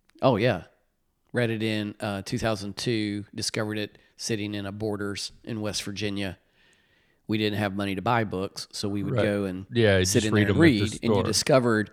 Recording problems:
none

